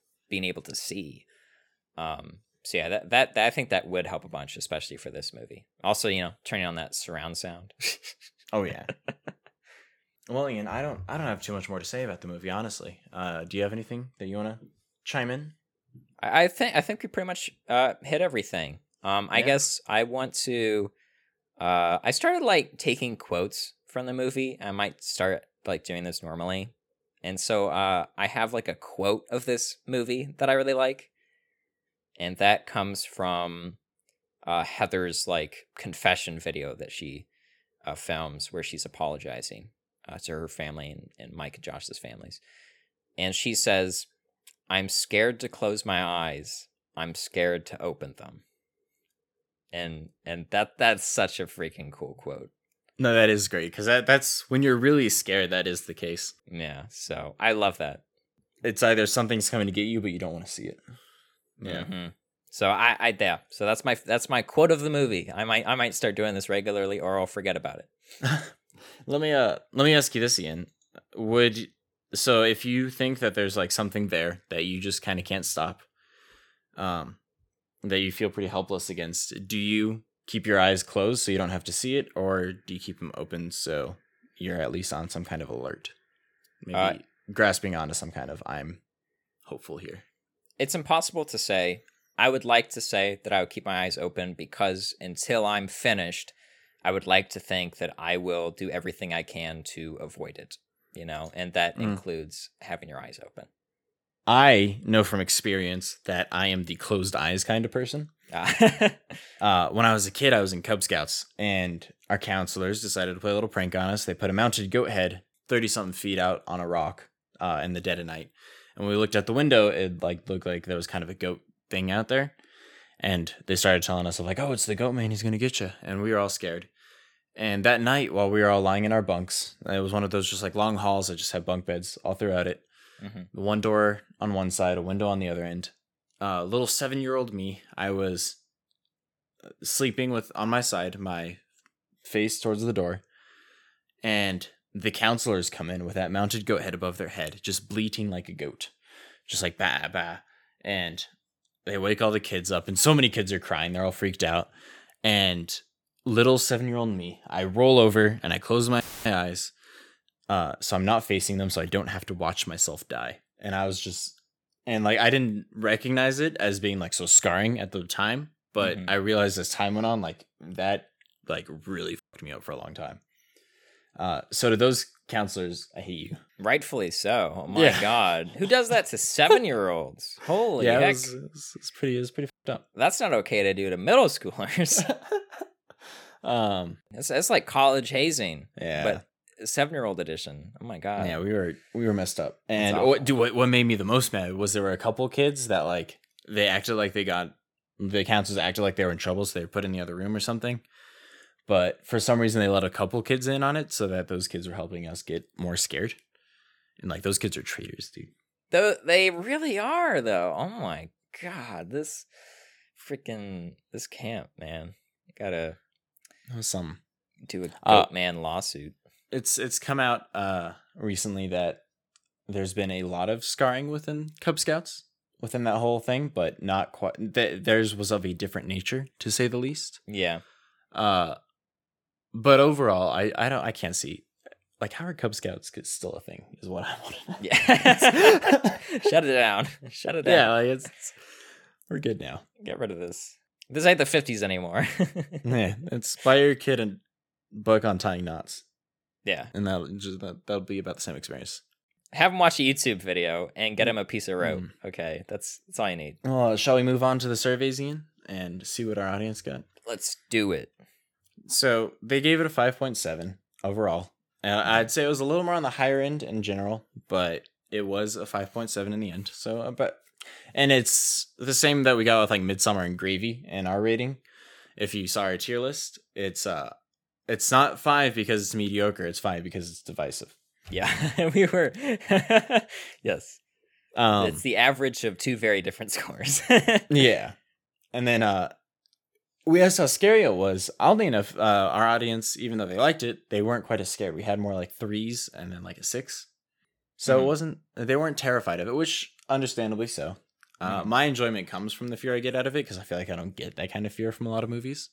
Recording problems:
audio cutting out; filled with static; at 2:39

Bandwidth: 18 kHz